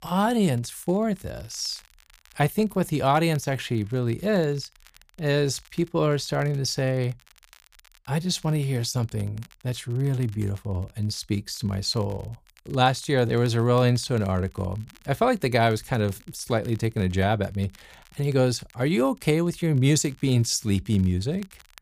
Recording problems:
crackle, like an old record; faint; 30 dB below the speech

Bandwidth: 15 kHz